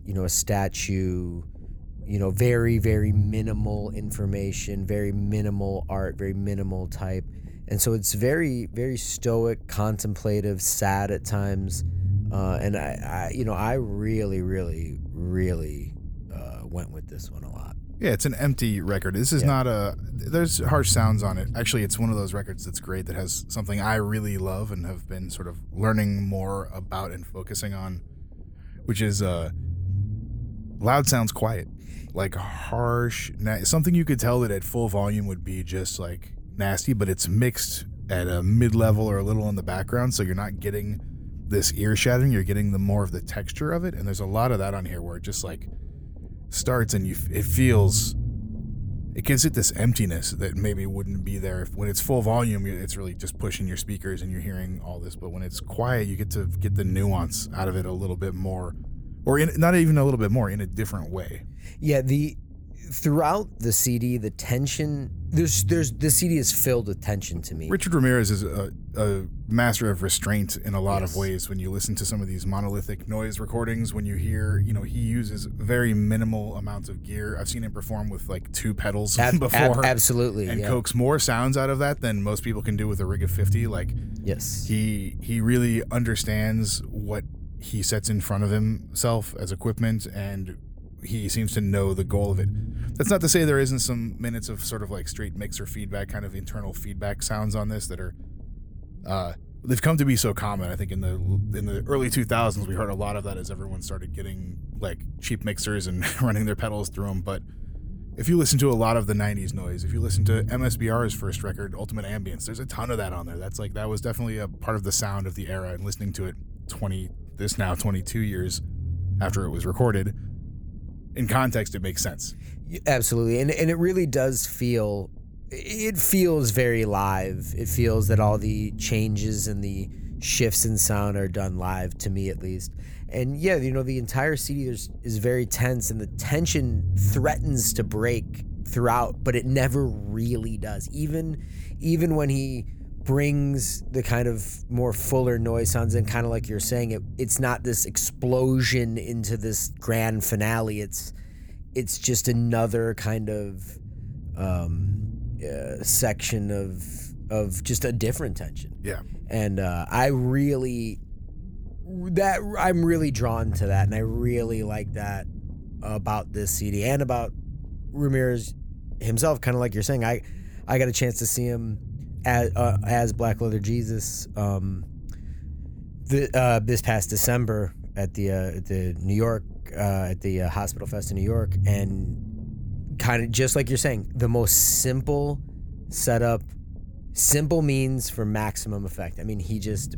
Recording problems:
low rumble; faint; throughout; 20 dB below the speech

